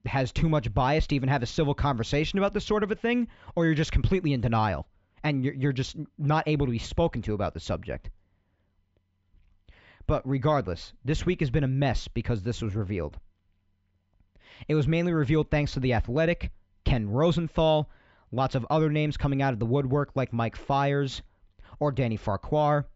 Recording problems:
high frequencies cut off; noticeable; nothing above 8 kHz
muffled; very slightly; fading above 3 kHz

